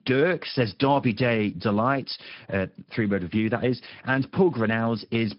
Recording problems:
high frequencies cut off; noticeable; nothing above 5.5 kHz
garbled, watery; slightly

